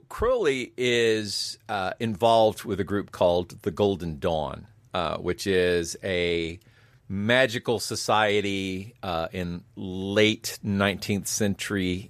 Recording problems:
none

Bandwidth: 14.5 kHz